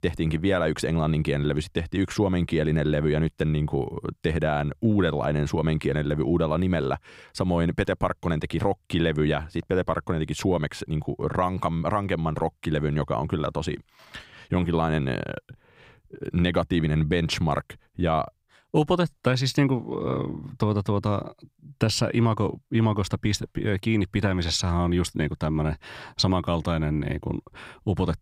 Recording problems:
none

